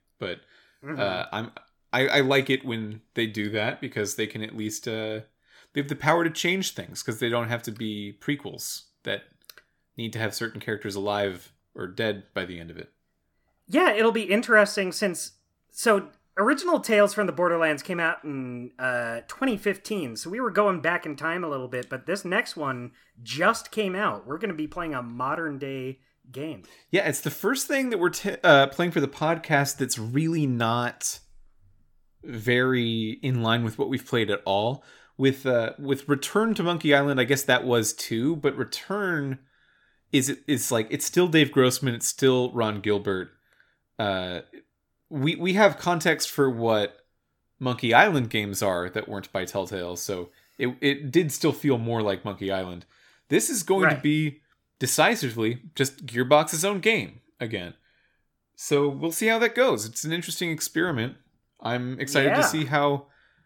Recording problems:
none

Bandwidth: 17.5 kHz